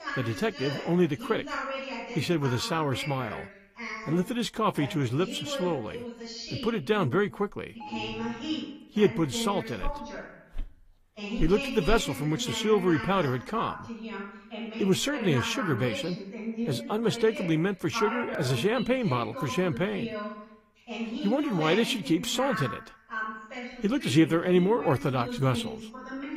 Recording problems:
garbled, watery; slightly; nothing above 15 kHz
voice in the background; loud; throughout; 9 dB below the speech
alarm; faint; at 8 s; peak 10 dB below the speech
footsteps; faint; from 10 to 12 s; peak 15 dB below the speech

